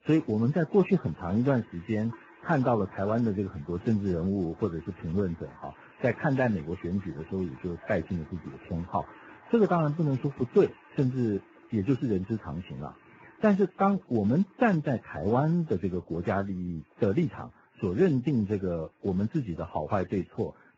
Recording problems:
garbled, watery; badly; nothing above 16 kHz
household noises; faint; throughout; 25 dB below the speech

